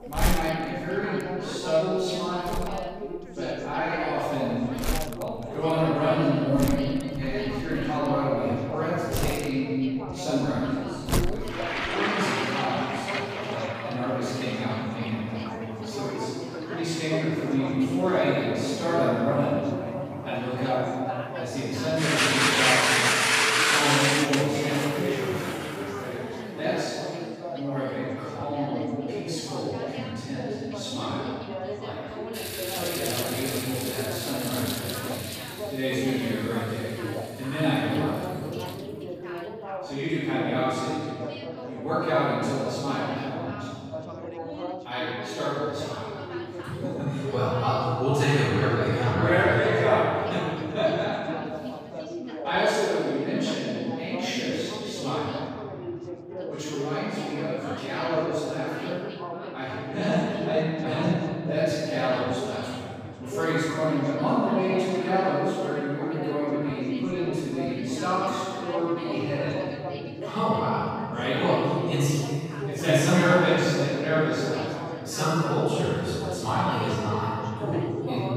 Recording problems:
room echo; strong; dies away in 2.4 s
off-mic speech; far
household noises; very loud; until 39 s; 1 dB above the speech
background chatter; loud; throughout; 4 voices, 9 dB below the speech

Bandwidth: 15 kHz